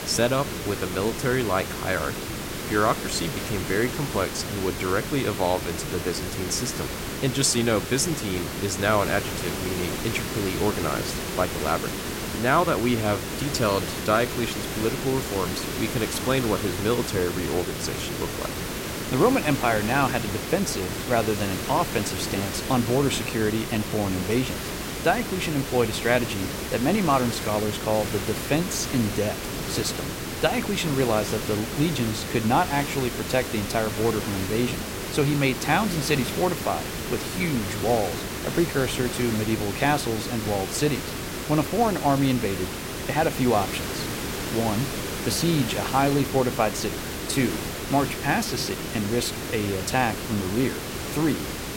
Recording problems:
hiss; loud; throughout; 5 dB below the speech

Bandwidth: 16 kHz